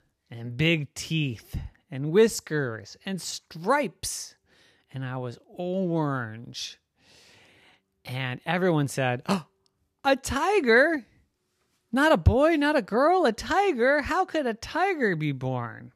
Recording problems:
none

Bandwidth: 14.5 kHz